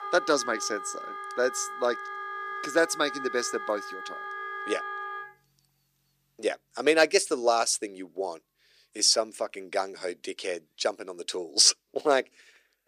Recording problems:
thin; somewhat; fading below 300 Hz
background music; loud; throughout; 10 dB below the speech

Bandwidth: 15 kHz